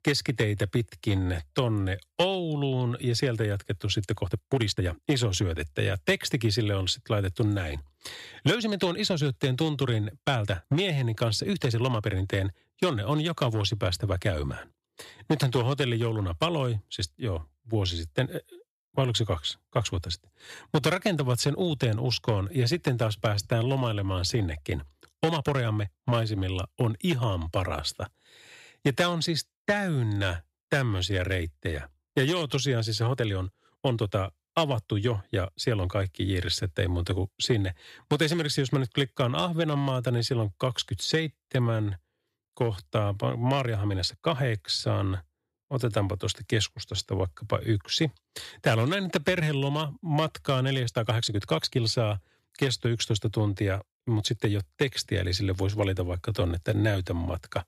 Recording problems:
uneven, jittery; strongly; from 1.5 to 57 s

